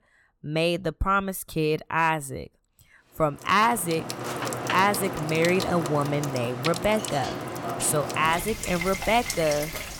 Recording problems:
household noises; loud; from 4 s on; 6 dB below the speech

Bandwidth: 17.5 kHz